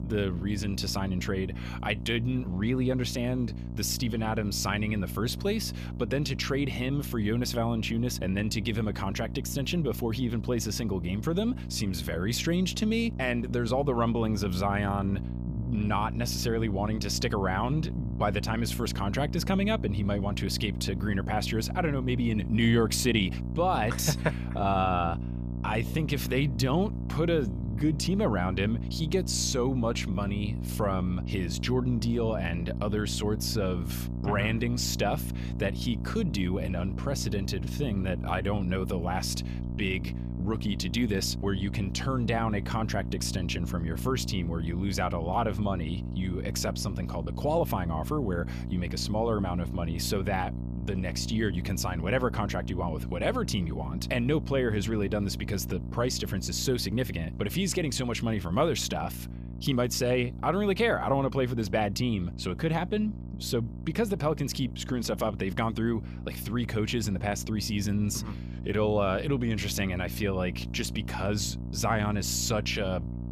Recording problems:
electrical hum; noticeable; throughout; 60 Hz, 15 dB below the speech

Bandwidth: 14.5 kHz